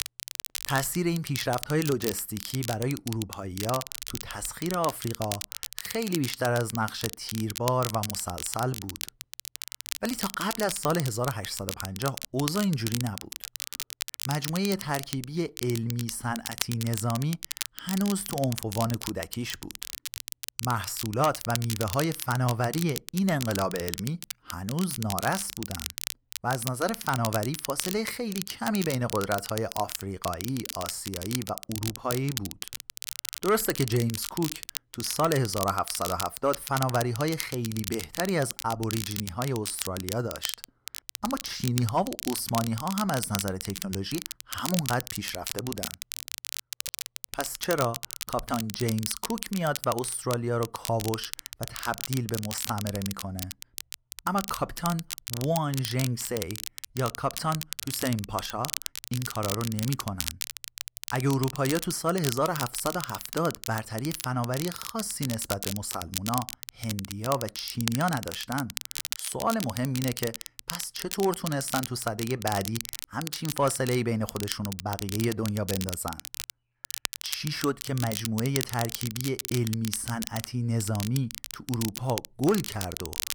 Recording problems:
crackle, like an old record; loud; 6 dB below the speech

